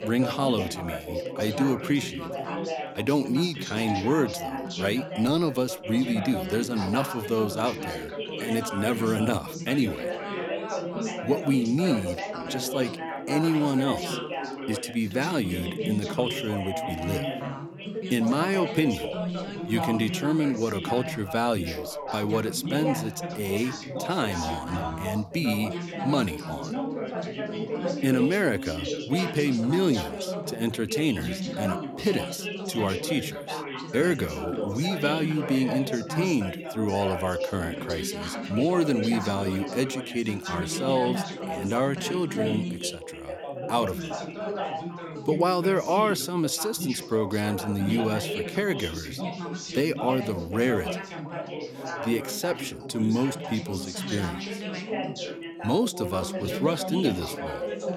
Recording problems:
background chatter; loud; throughout; 3 voices, 5 dB below the speech

